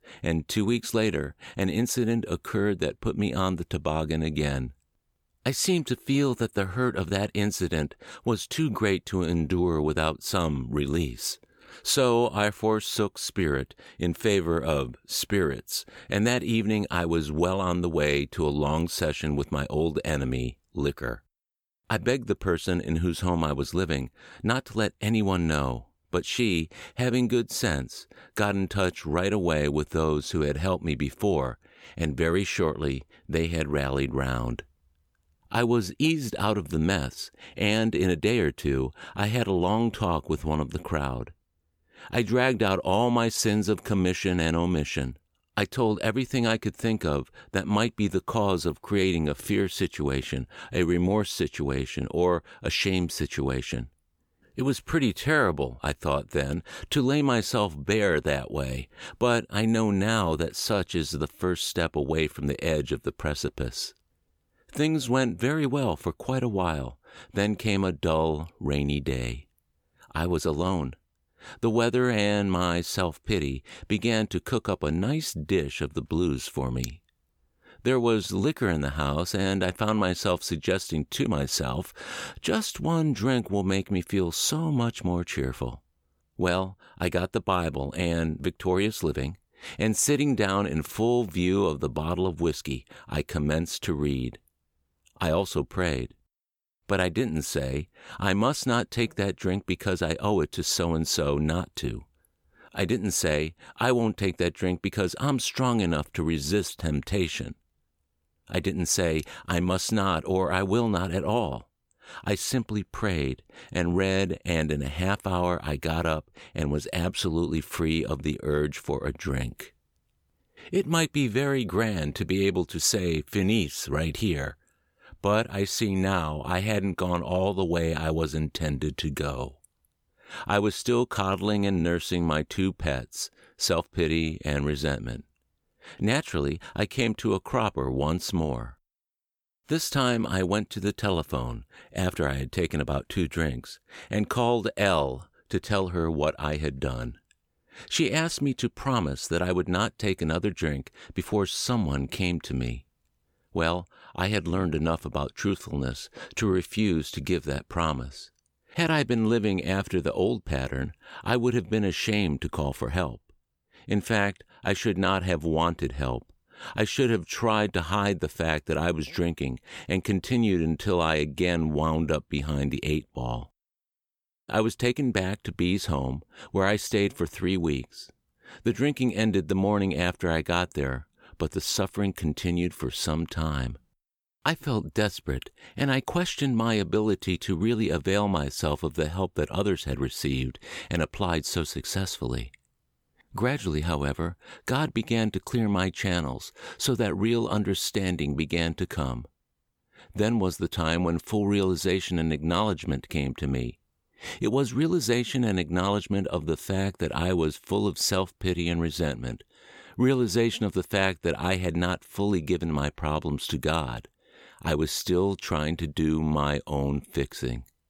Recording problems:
none

